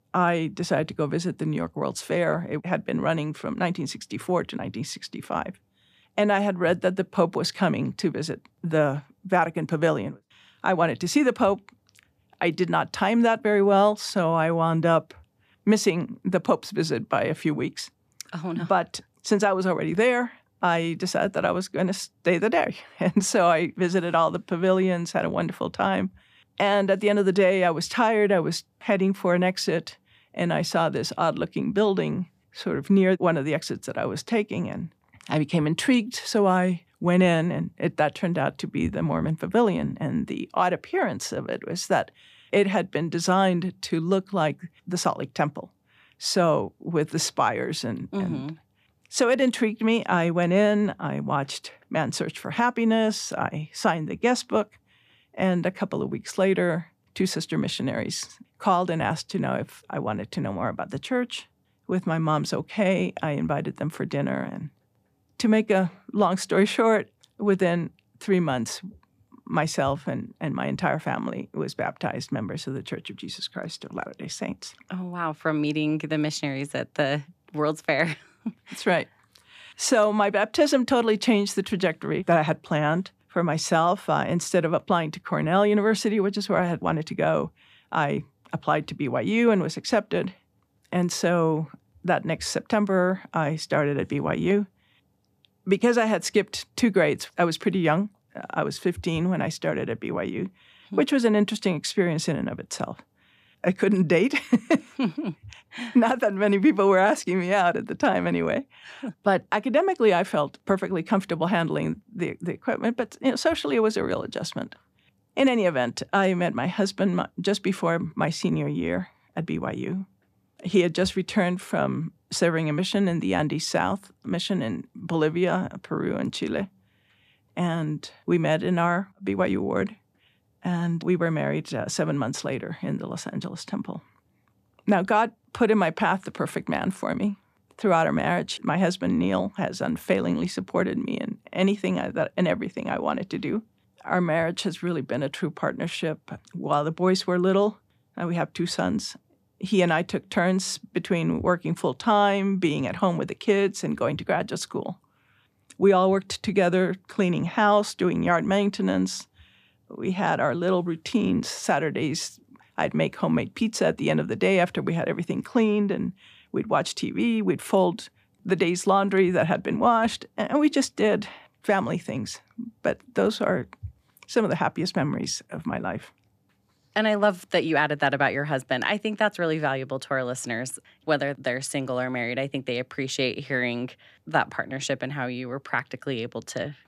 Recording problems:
none

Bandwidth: 14.5 kHz